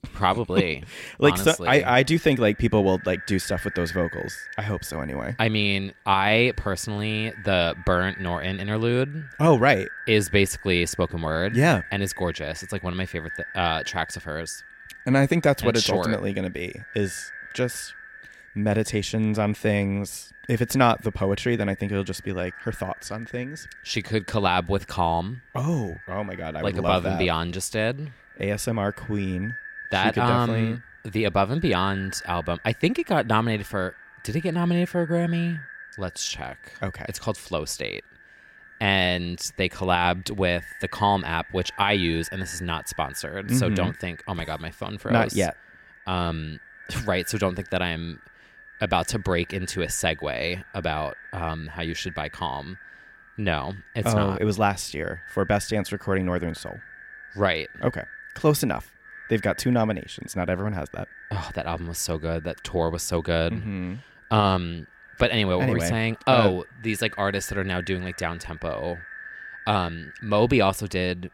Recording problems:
echo of what is said; noticeable; throughout; 510 ms later, 15 dB below the speech

